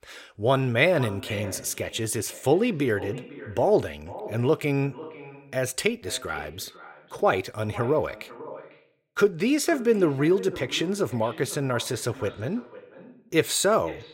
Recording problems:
echo of what is said; noticeable; throughout; 500 ms later, 15 dB below the speech

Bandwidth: 16 kHz